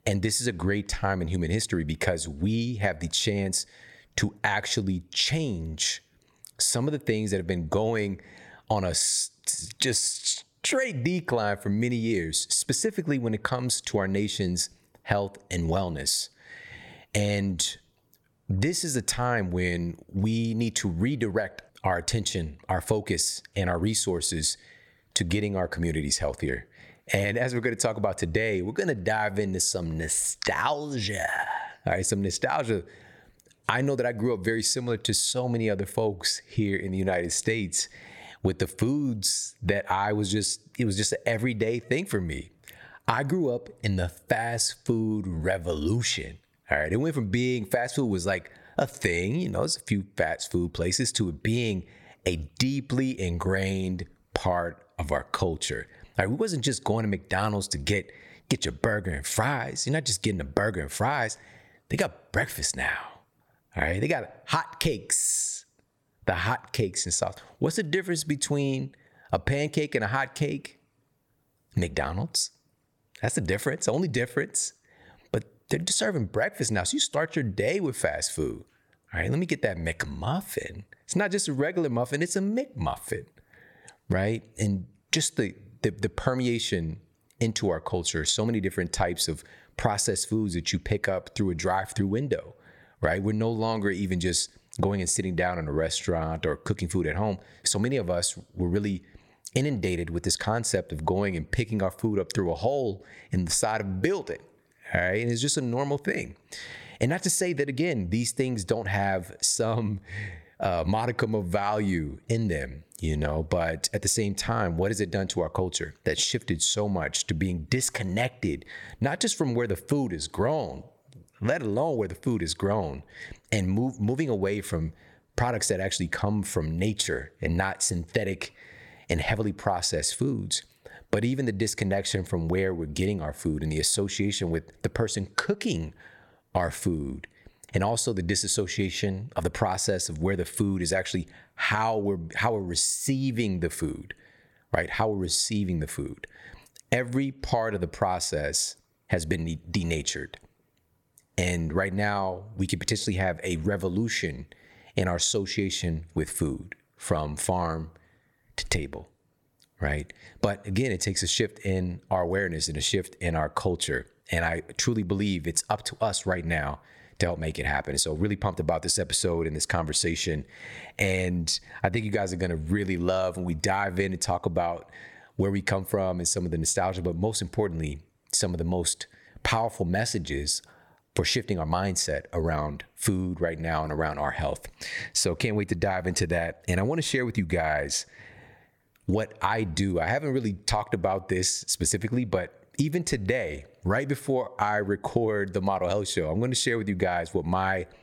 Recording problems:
squashed, flat; somewhat

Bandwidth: 17.5 kHz